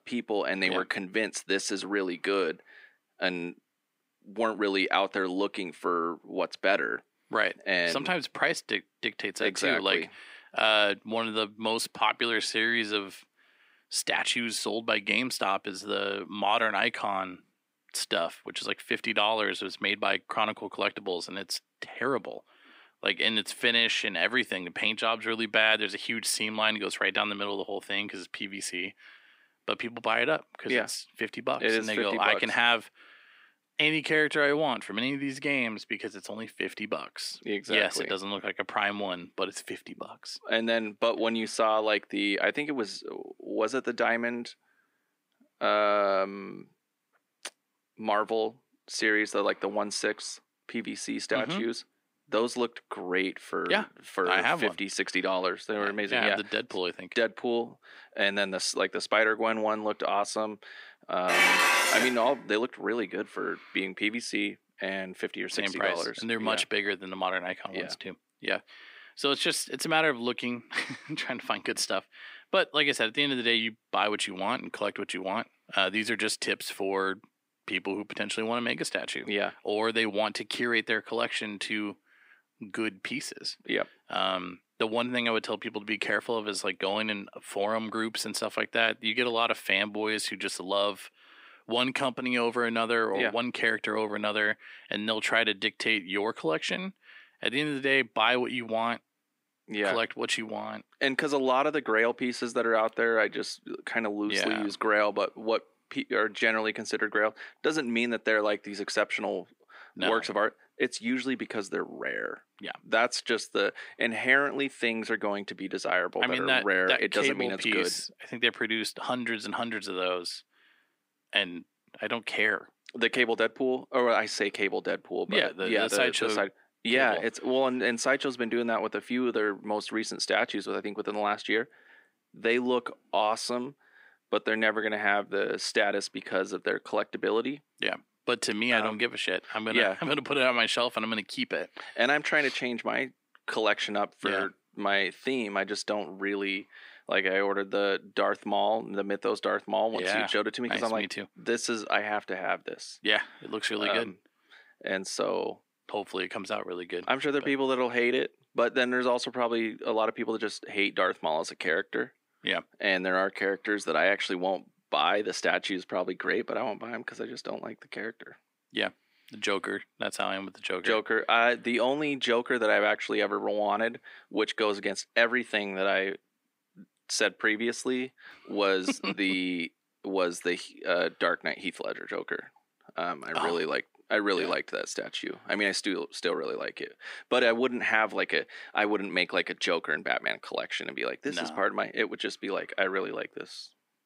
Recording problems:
thin; somewhat; fading below 250 Hz
clattering dishes; loud; at 1:01; peak 9 dB above the speech

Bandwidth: 15.5 kHz